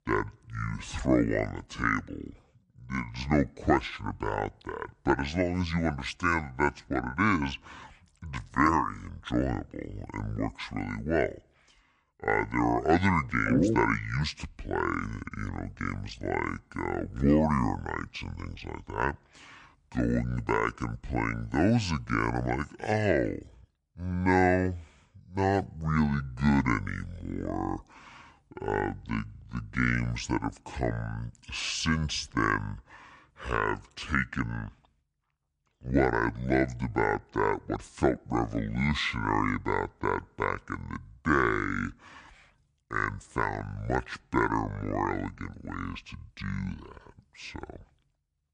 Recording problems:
wrong speed and pitch; too slow and too low; 0.6 times normal speed

